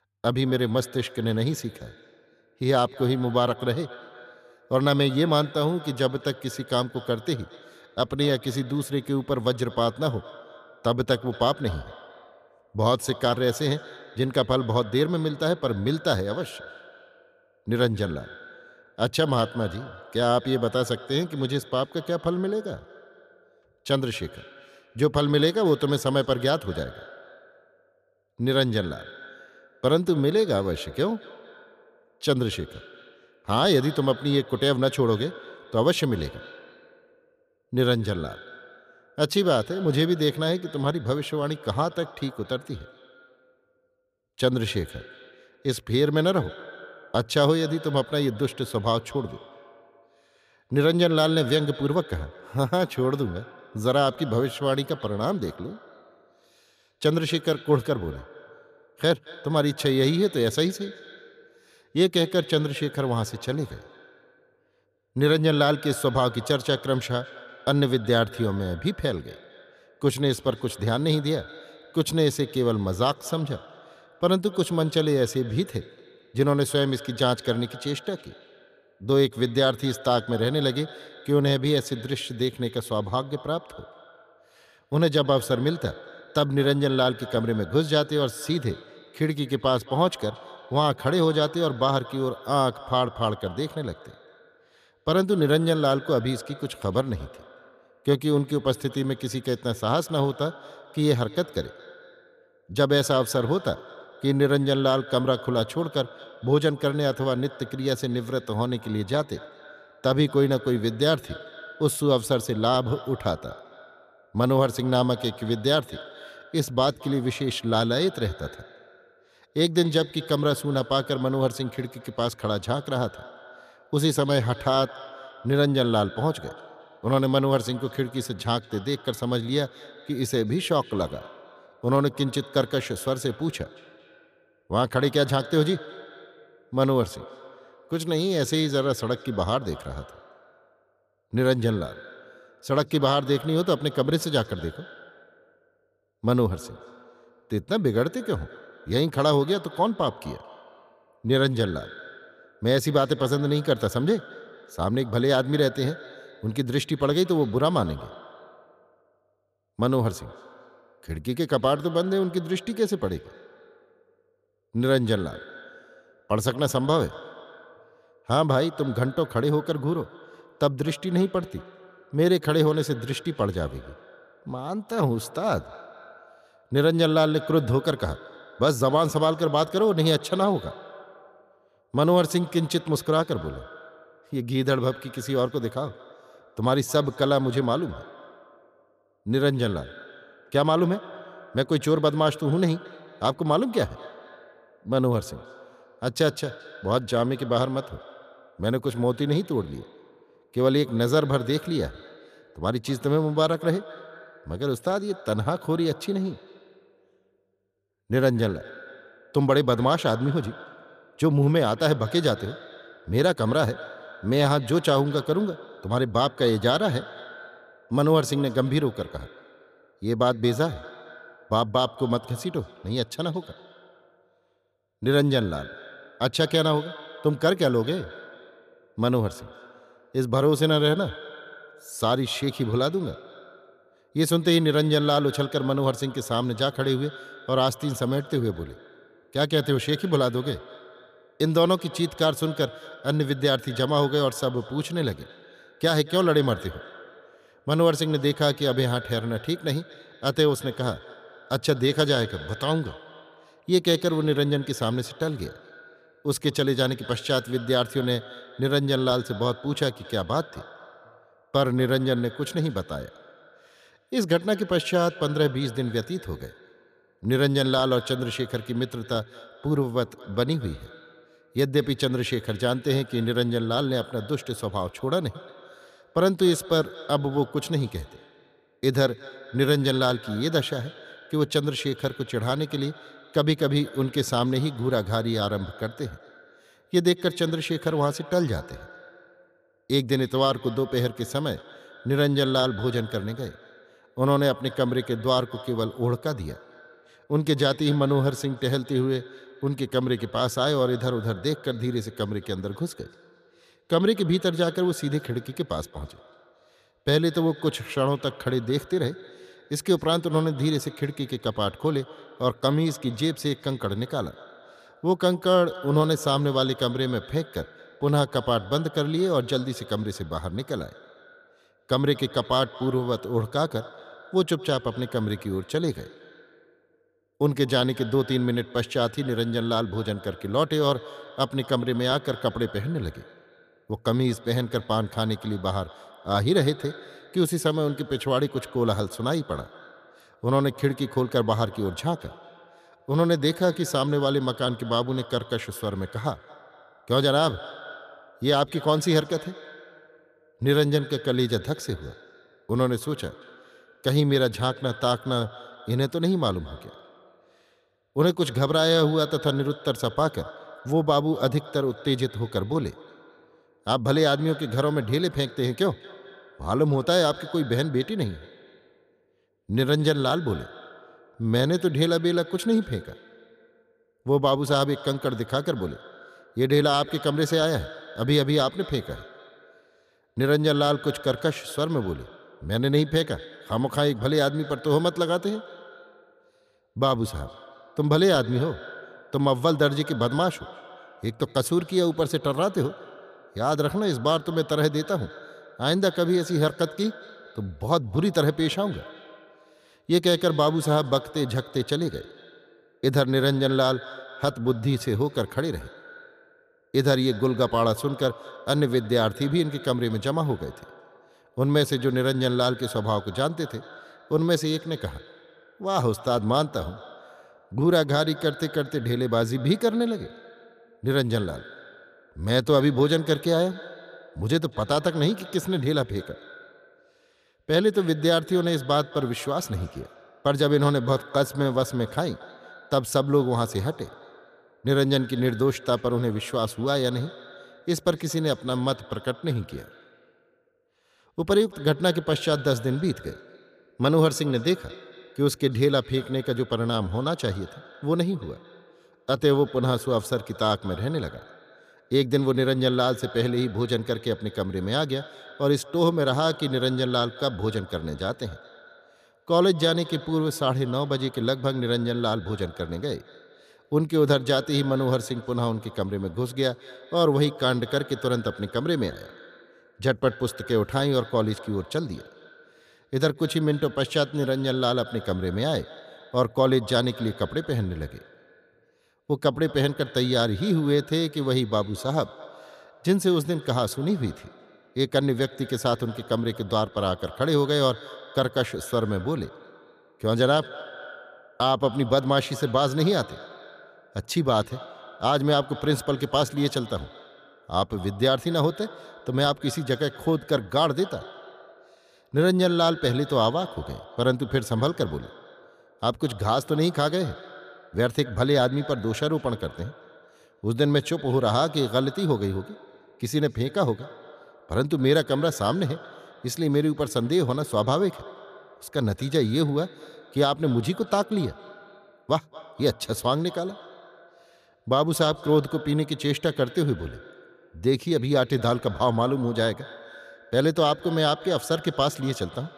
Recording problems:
echo of what is said; faint; throughout; 220 ms later, 20 dB below the speech

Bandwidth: 14.5 kHz